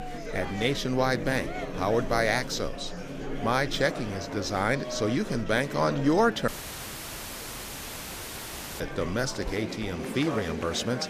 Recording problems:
murmuring crowd; loud; throughout; 9 dB below the speech
electrical hum; faint; until 9.5 s; 50 Hz, 25 dB below the speech
audio cutting out; filled with static; at 6.5 s for 2.5 s

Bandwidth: 14.5 kHz